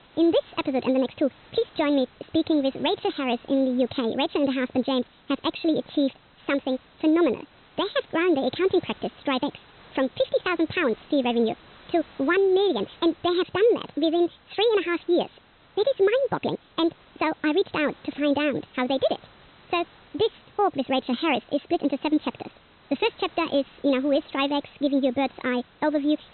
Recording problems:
high frequencies cut off; severe; nothing above 4 kHz
wrong speed and pitch; too fast and too high; 1.5 times normal speed
hiss; faint; throughout; 25 dB below the speech

